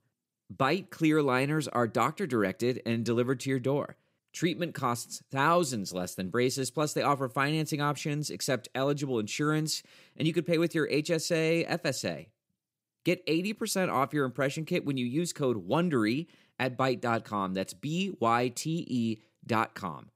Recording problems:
none

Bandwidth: 15.5 kHz